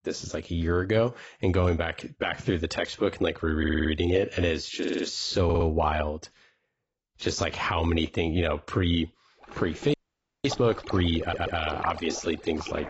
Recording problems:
garbled, watery; badly; nothing above 7.5 kHz
rain or running water; noticeable; from 9.5 s on; 15 dB below the speech
audio stuttering; 4 times, first at 3.5 s
audio freezing; at 10 s for 0.5 s

